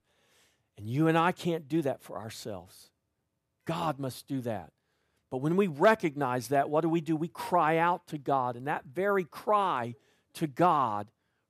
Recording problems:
none

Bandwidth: 14.5 kHz